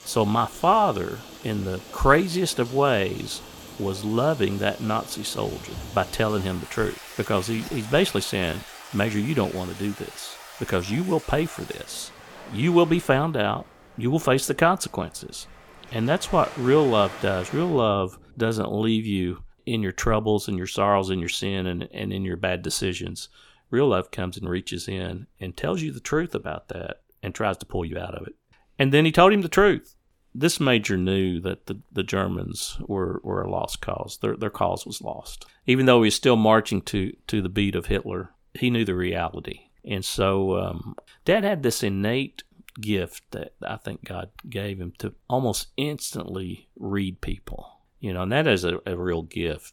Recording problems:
rain or running water; noticeable; until 18 s; 15 dB below the speech

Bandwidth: 18 kHz